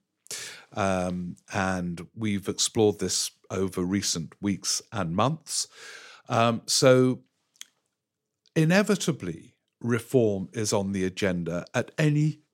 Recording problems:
none

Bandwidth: 16 kHz